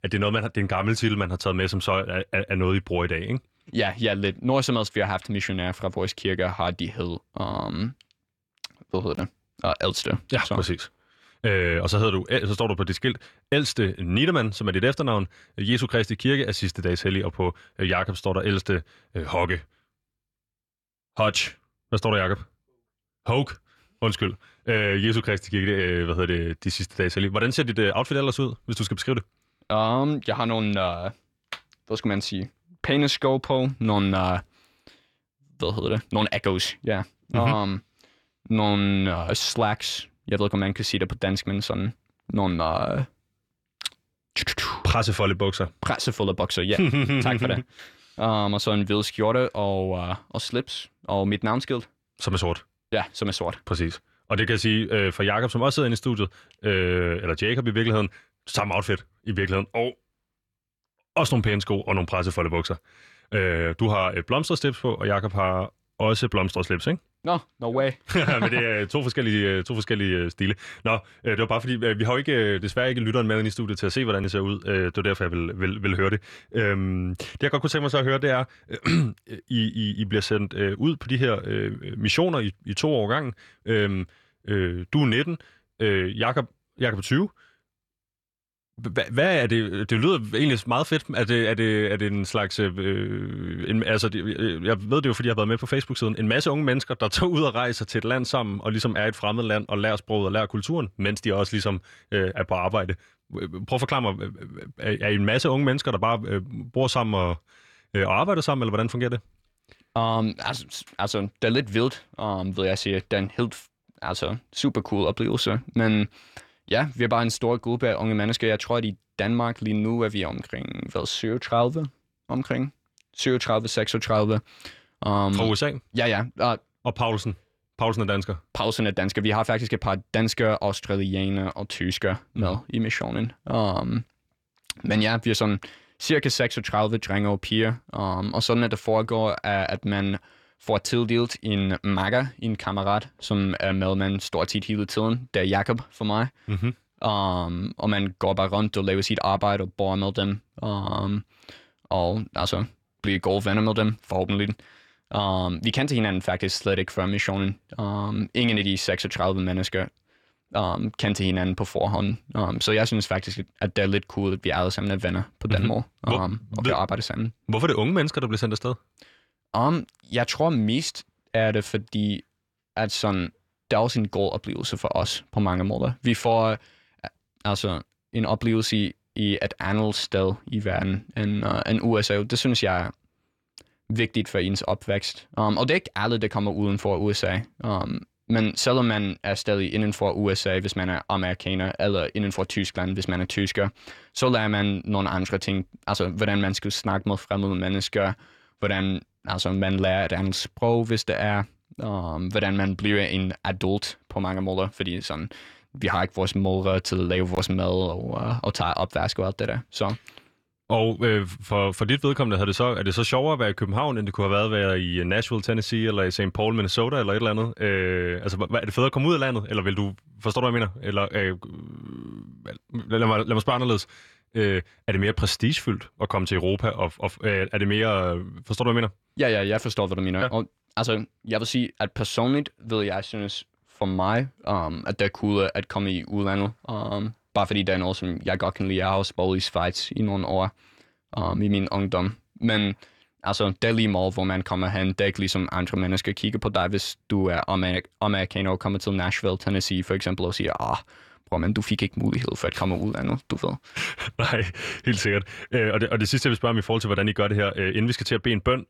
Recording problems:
none

